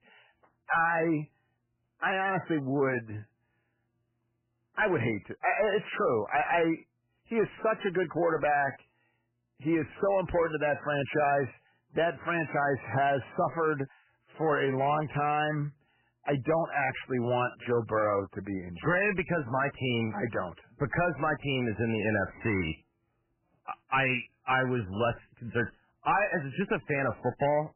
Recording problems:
garbled, watery; badly; nothing above 3 kHz
distortion; slight; 10 dB below the speech

